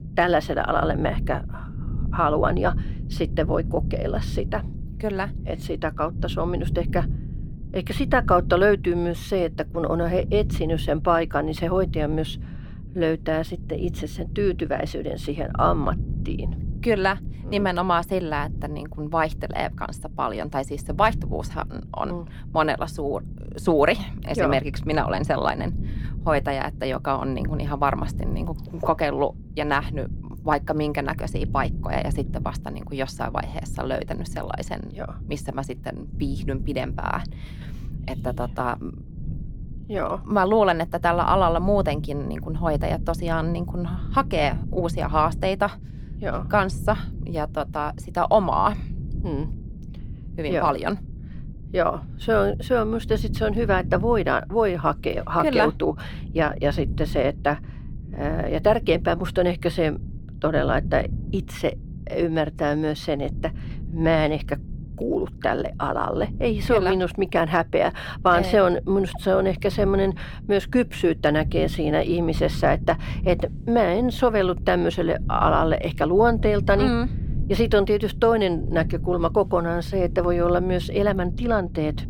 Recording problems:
low rumble; faint; throughout; 20 dB below the speech

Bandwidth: 18 kHz